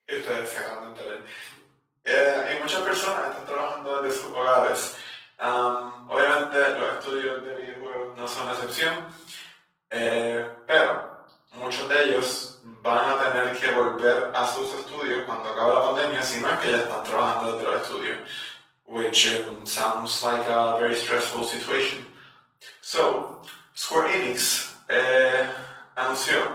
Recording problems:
off-mic speech; far
thin; very; fading below 850 Hz
room echo; noticeable; dies away in 0.7 s
garbled, watery; slightly; nothing above 16.5 kHz

